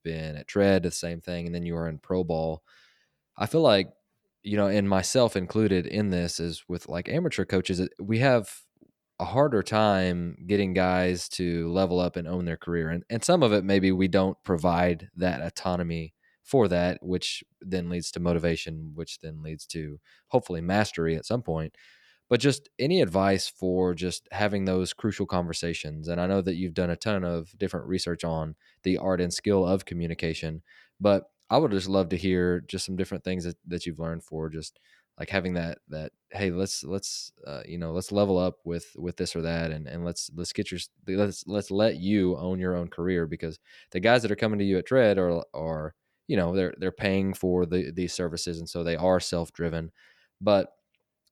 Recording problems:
none

